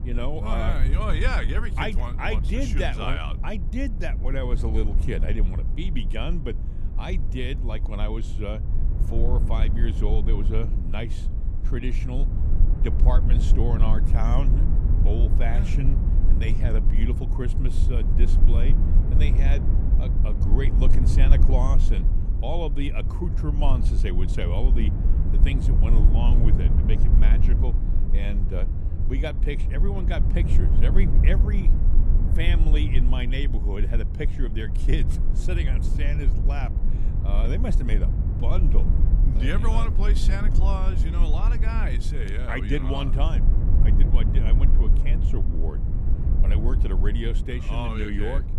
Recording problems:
low rumble; loud; throughout; 6 dB below the speech

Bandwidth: 14.5 kHz